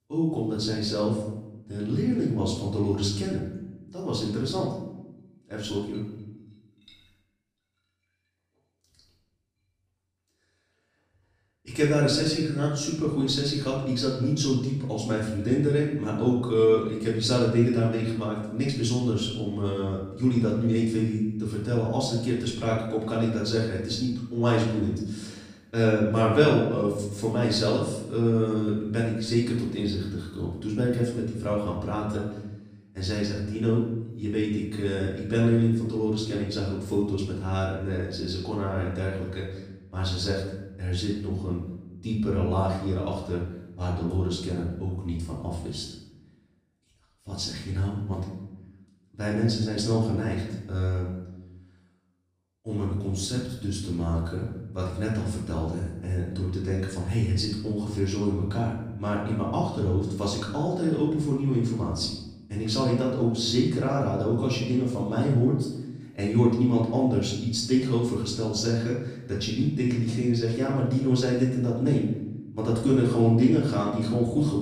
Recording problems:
off-mic speech; far
room echo; noticeable; dies away in 0.8 s

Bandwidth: 15 kHz